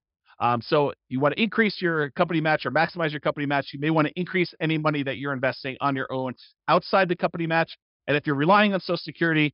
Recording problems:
high frequencies cut off; noticeable; nothing above 5.5 kHz

